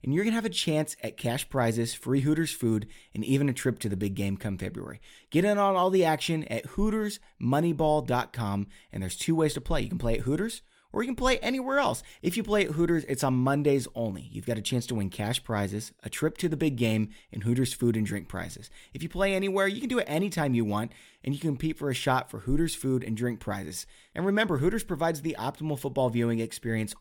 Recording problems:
none

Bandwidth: 17.5 kHz